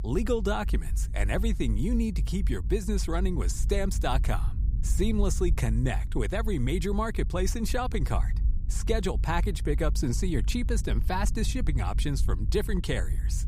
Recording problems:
low rumble; noticeable; throughout; 15 dB below the speech

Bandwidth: 15.5 kHz